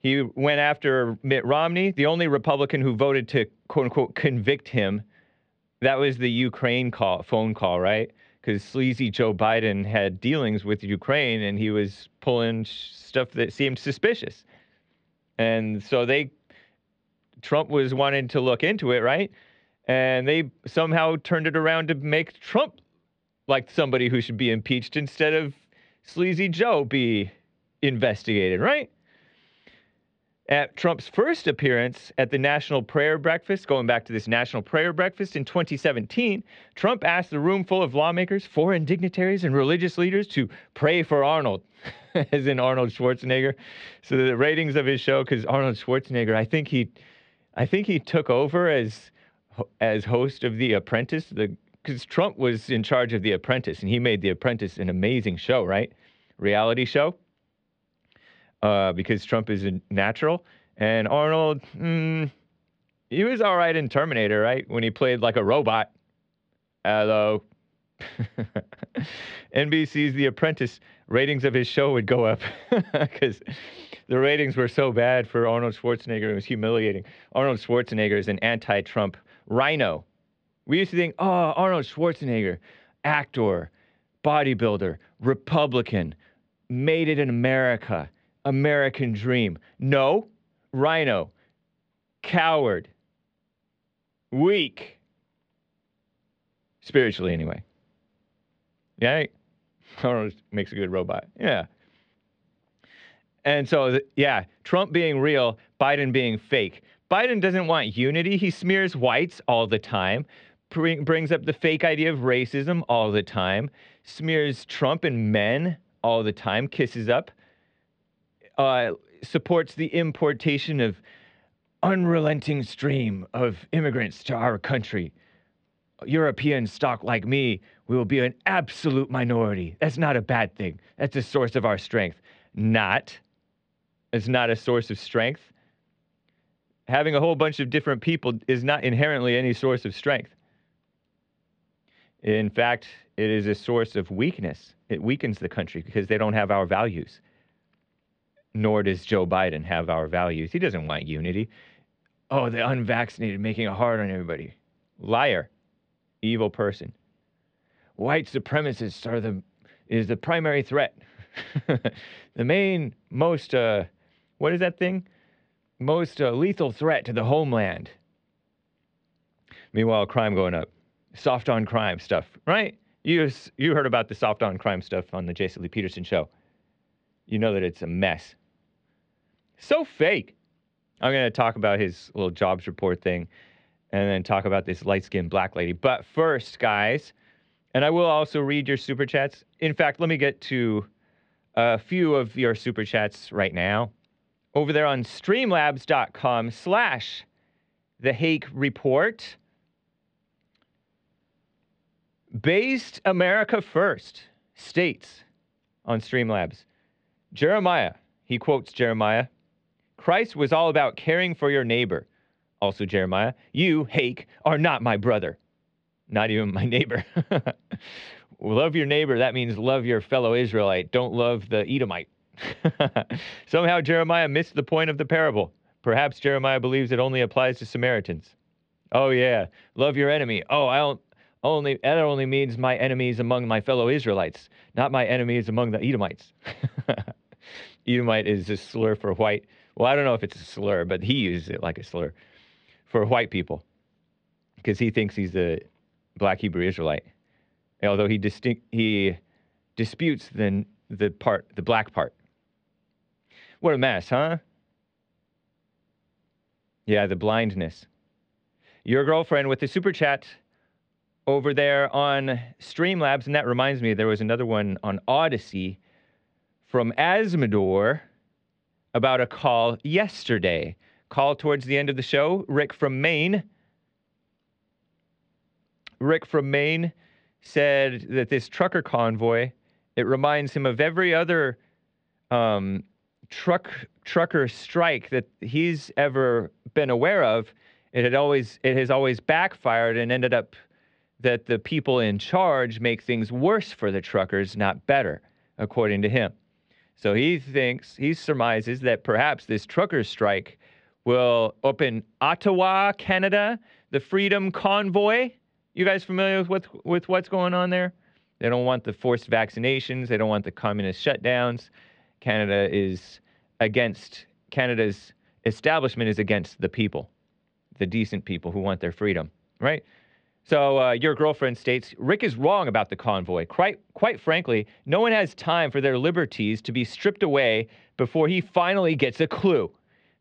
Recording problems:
muffled; slightly; fading above 3.5 kHz

